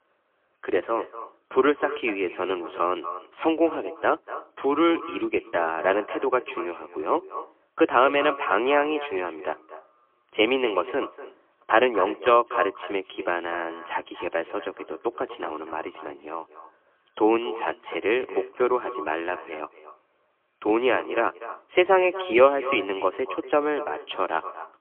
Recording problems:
phone-call audio; poor line; nothing above 3 kHz
echo of what is said; noticeable; throughout; 240 ms later, 15 dB below the speech

